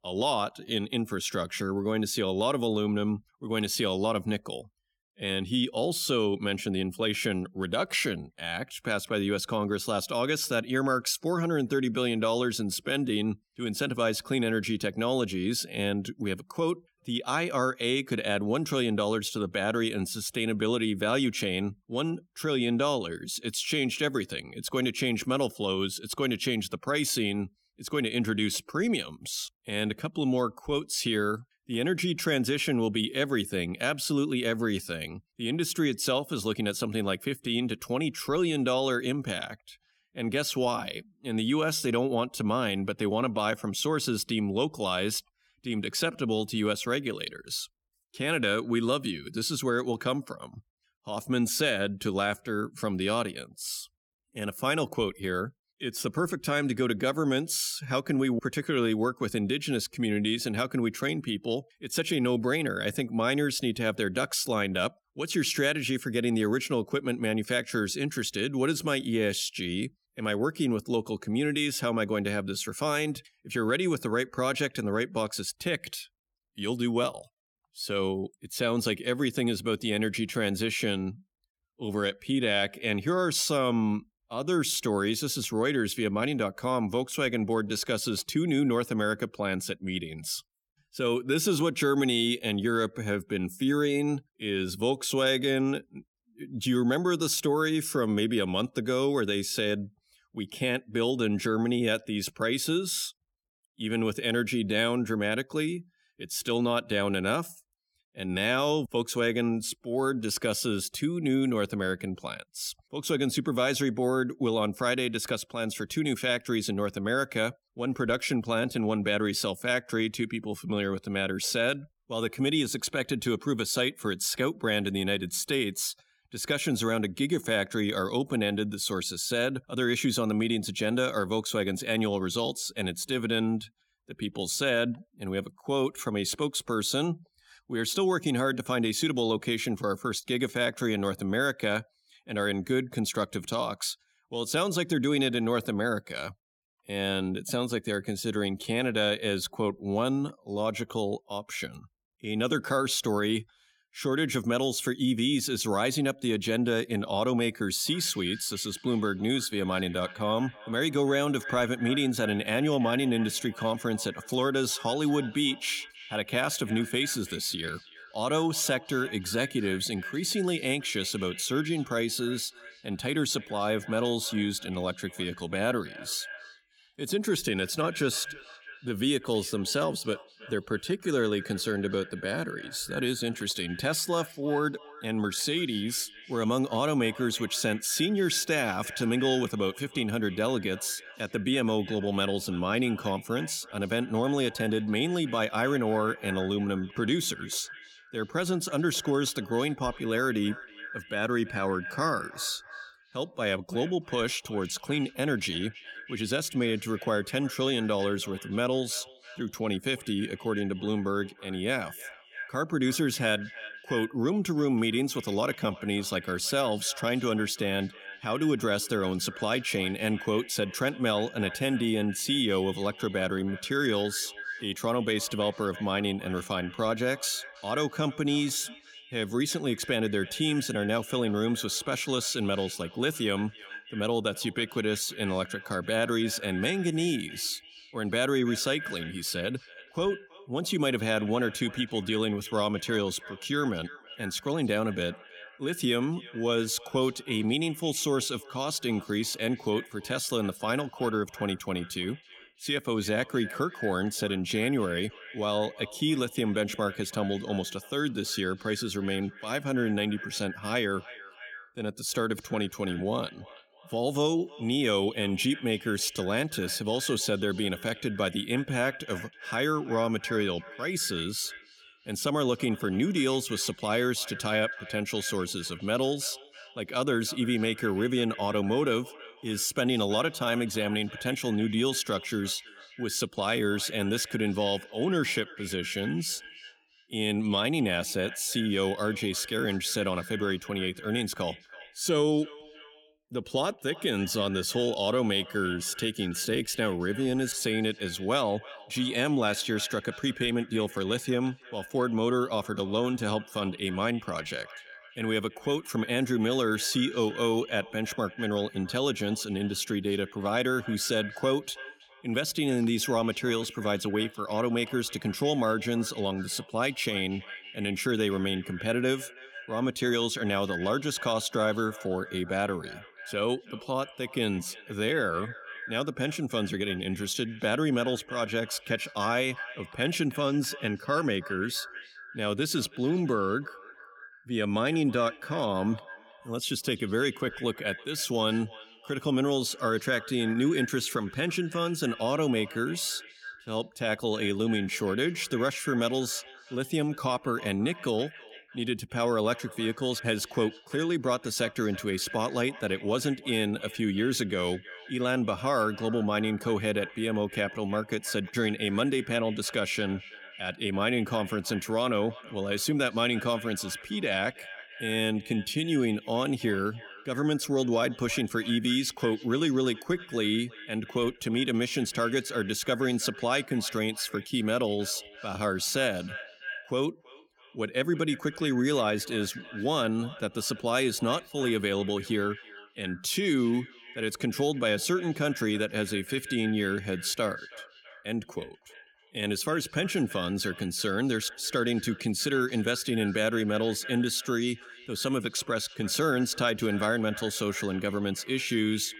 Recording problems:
echo of what is said; noticeable; from 2:38 on; 330 ms later, 15 dB below the speech

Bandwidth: 18 kHz